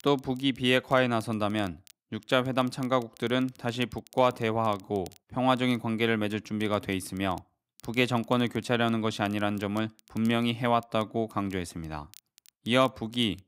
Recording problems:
crackle, like an old record; faint; 30 dB below the speech

